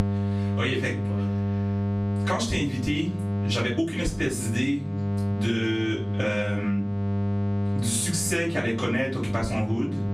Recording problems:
off-mic speech; far
room echo; slight; dies away in 0.3 s
squashed, flat; somewhat
electrical hum; loud; throughout; 50 Hz, 9 dB below the speech

